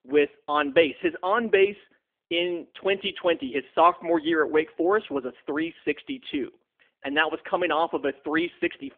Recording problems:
phone-call audio; nothing above 3.5 kHz

